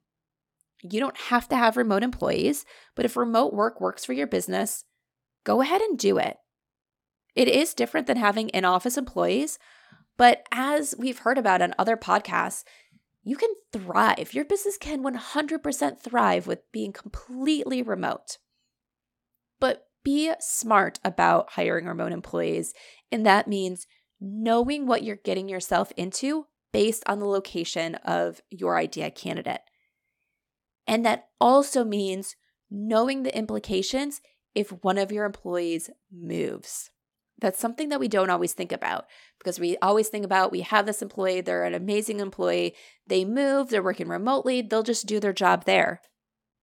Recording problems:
none

